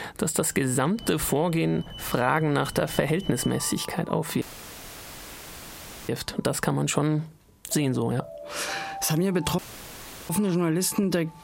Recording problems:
squashed, flat; heavily, background pumping
alarms or sirens; noticeable; throughout; 15 dB below the speech
audio cutting out; filled with static; at 4.5 s for 1.5 s and at 9.5 s for 0.5 s

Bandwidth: 16 kHz